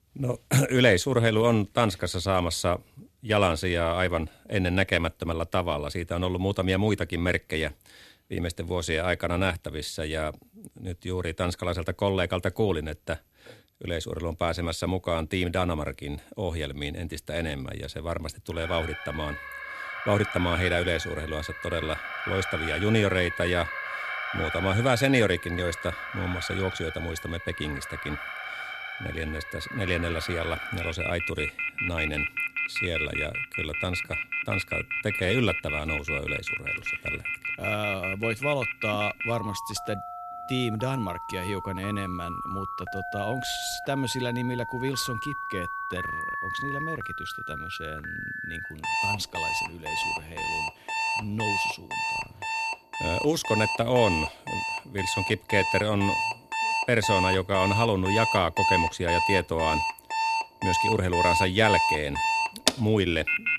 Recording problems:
alarms or sirens; loud; from 19 s on; 2 dB below the speech

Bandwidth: 14.5 kHz